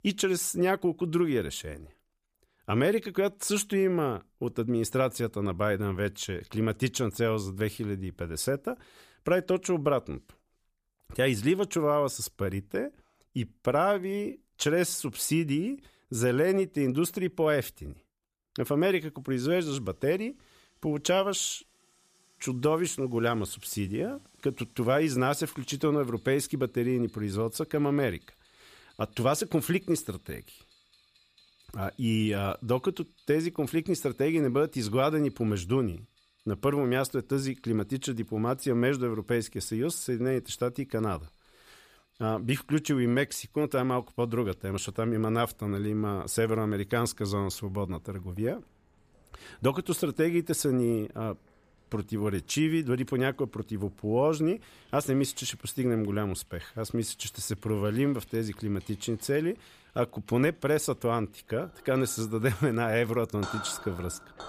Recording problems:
household noises; faint; from 19 s on; 25 dB below the speech

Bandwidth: 15 kHz